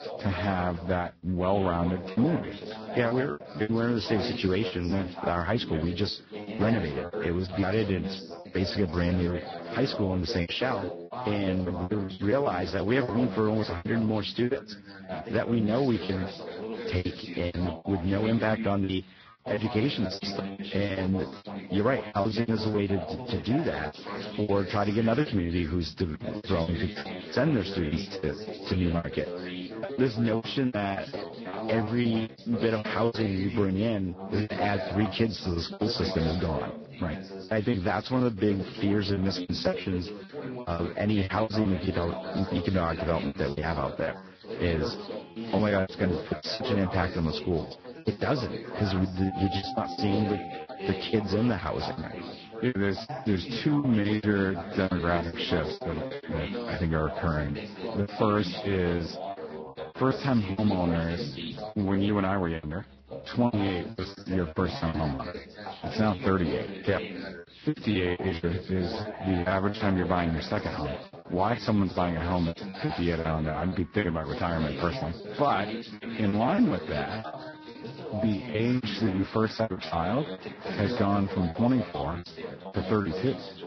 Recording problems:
garbled, watery; badly; nothing above 5.5 kHz
background chatter; loud; throughout; 2 voices, 9 dB below the speech
background music; noticeable; from 45 s on; 20 dB below the speech
choppy; very; 14% of the speech affected

